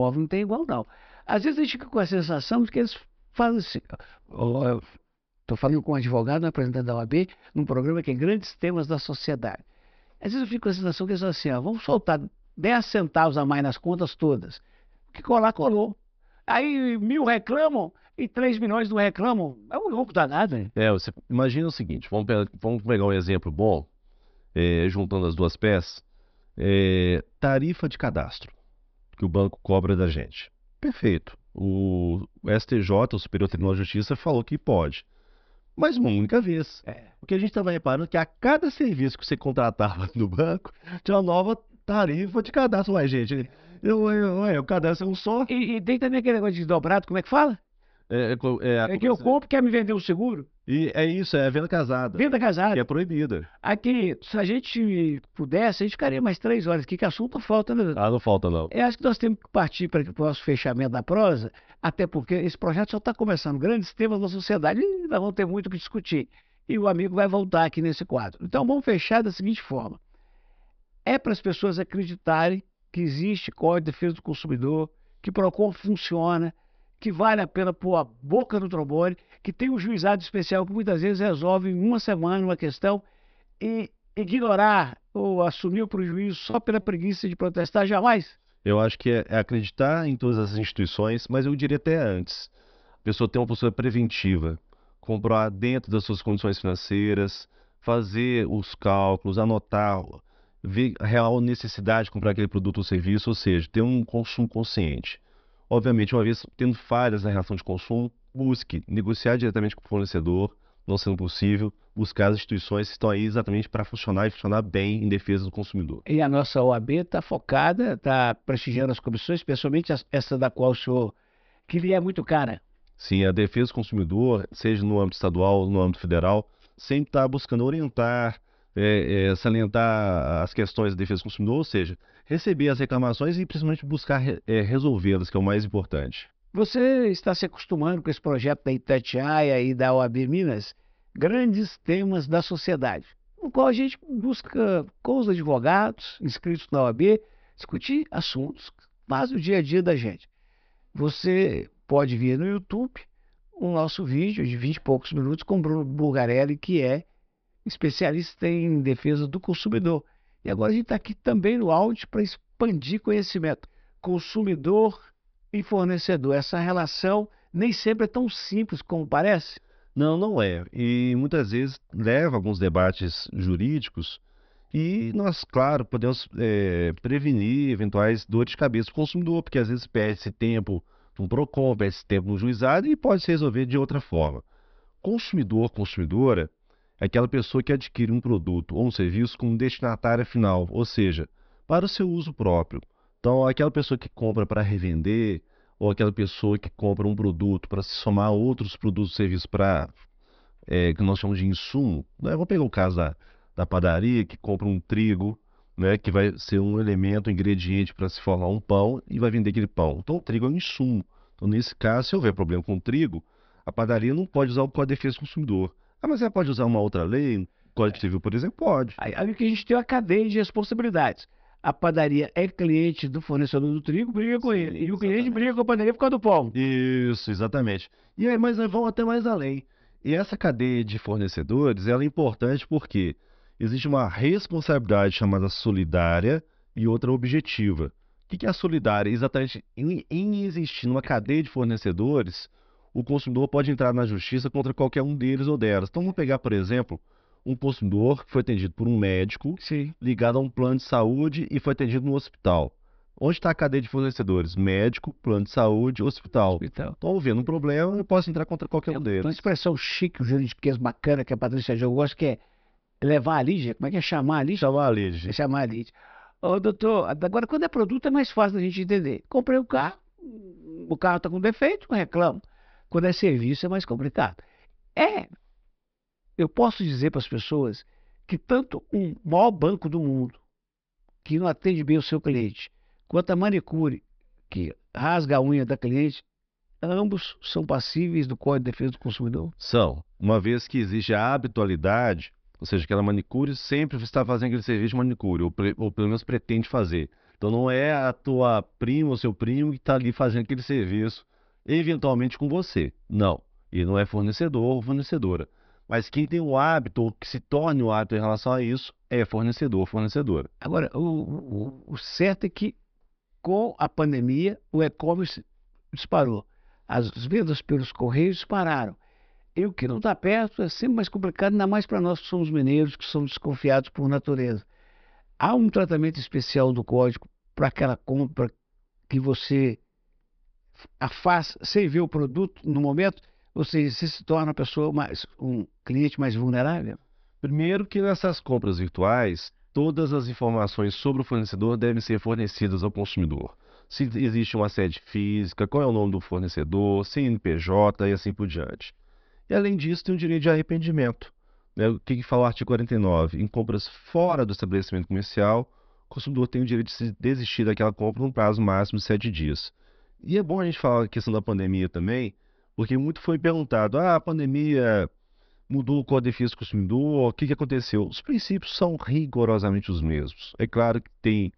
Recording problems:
high frequencies cut off; noticeable; nothing above 5.5 kHz
abrupt cut into speech; at the start
choppy; occasionally; from 1:26 to 1:28; 4% of the speech affected

